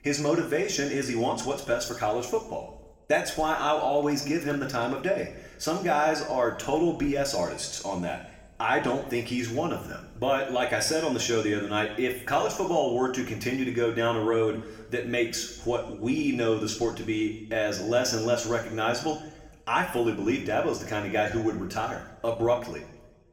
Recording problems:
room echo; slight; dies away in 0.8 s
off-mic speech; somewhat distant

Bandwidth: 16.5 kHz